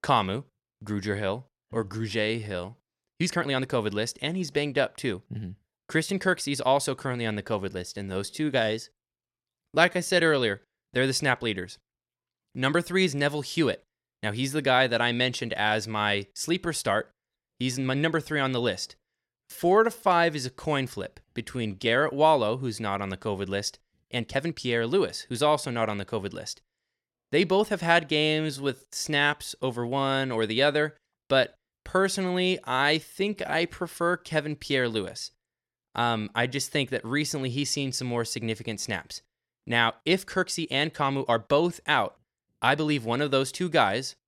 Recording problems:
uneven, jittery; strongly; from 2 to 43 s

